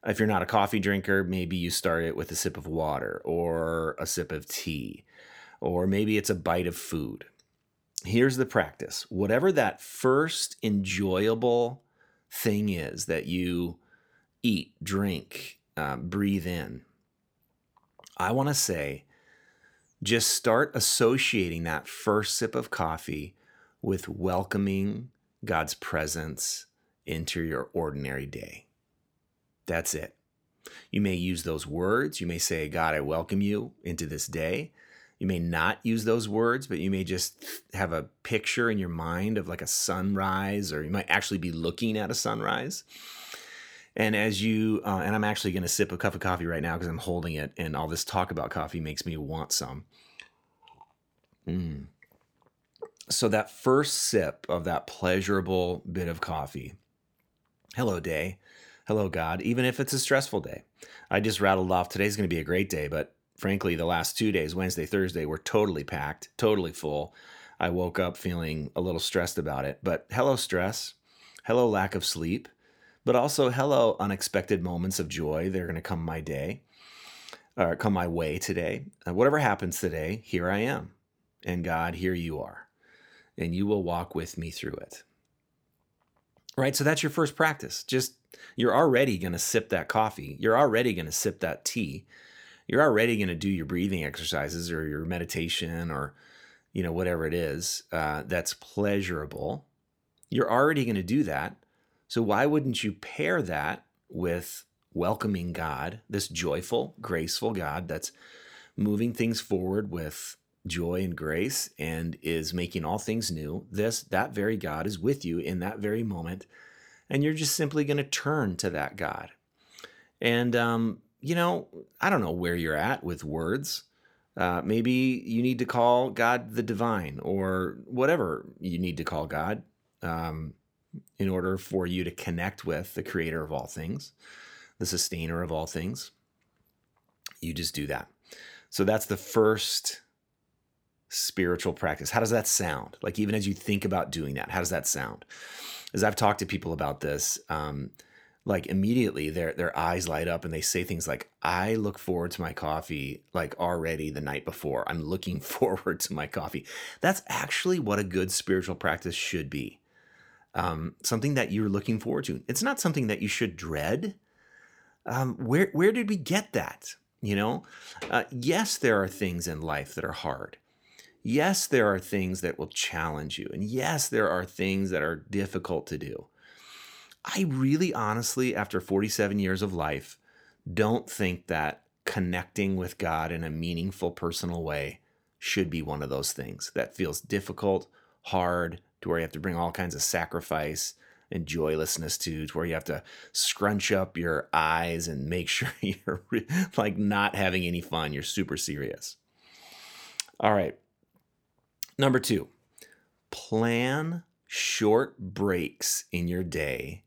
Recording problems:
none

